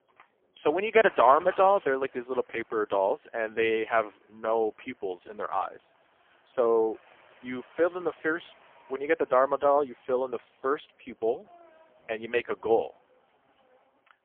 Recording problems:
phone-call audio; poor line; nothing above 3.5 kHz
traffic noise; faint; throughout; 25 dB below the speech

